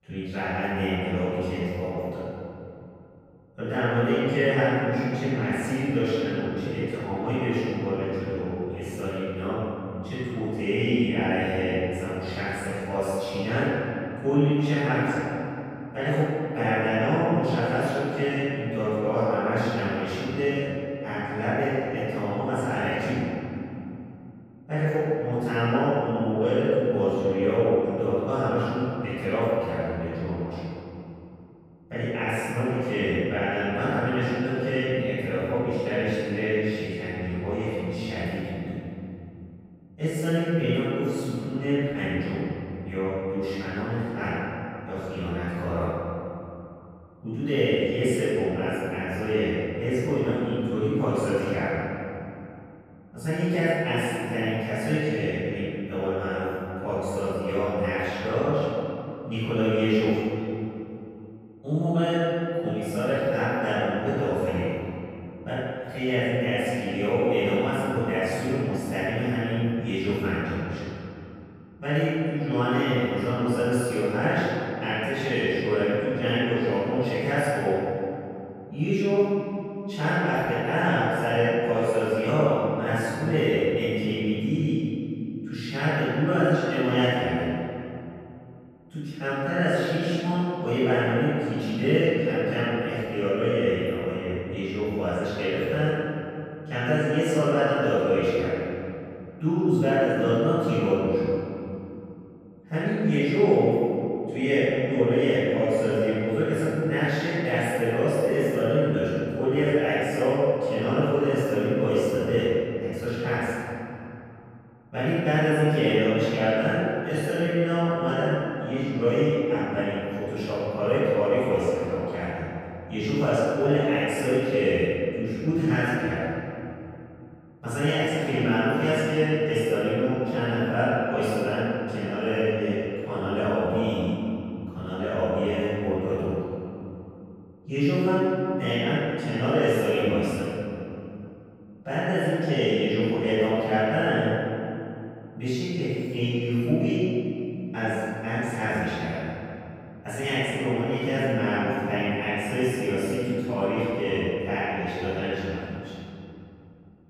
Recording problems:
room echo; strong; dies away in 2.8 s
off-mic speech; far

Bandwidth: 15.5 kHz